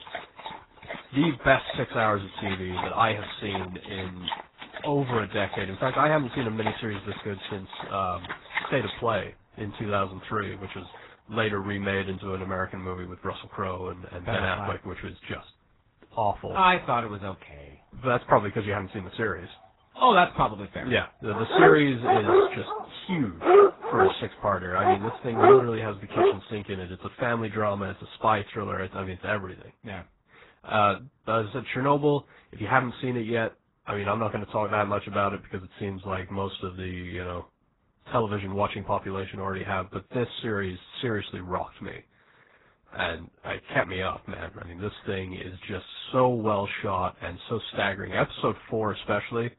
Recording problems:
garbled, watery; badly; nothing above 4 kHz
animal sounds; very loud; until 26 s; 2 dB above the speech

